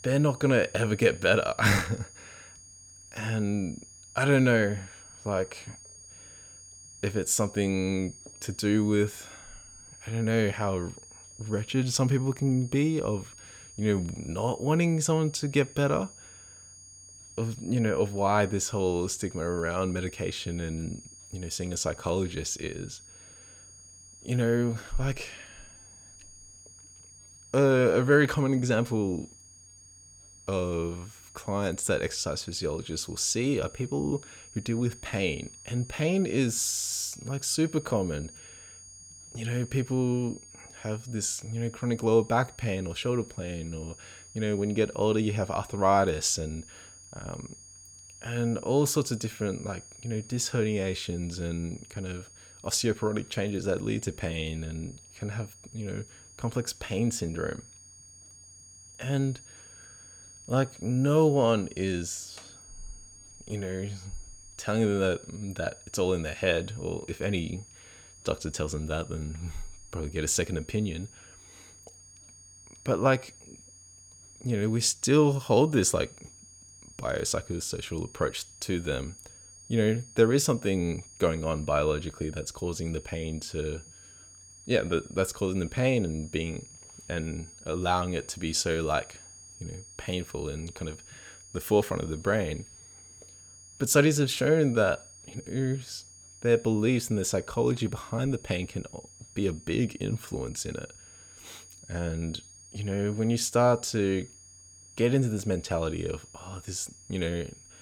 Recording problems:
high-pitched whine; noticeable; throughout; 6.5 kHz, 20 dB below the speech

